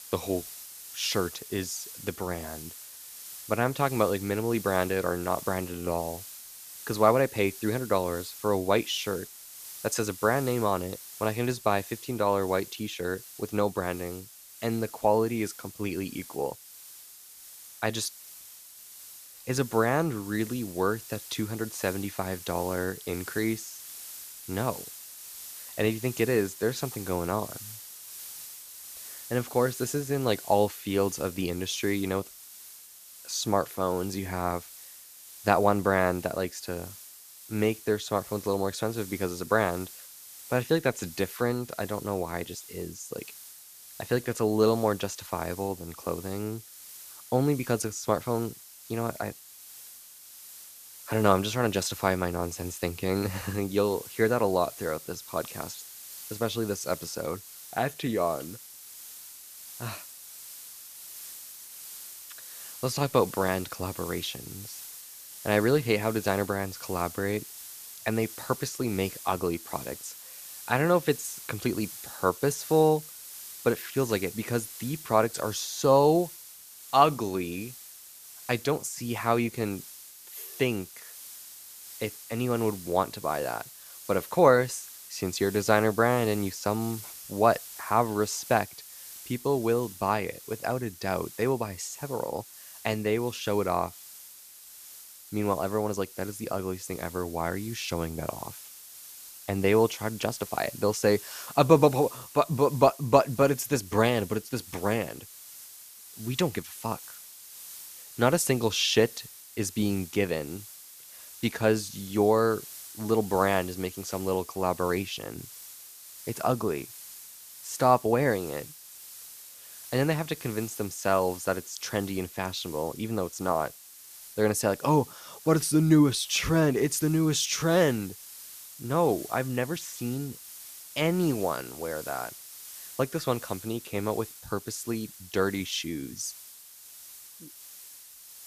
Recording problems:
hiss; noticeable; throughout; 15 dB below the speech

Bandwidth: 14.5 kHz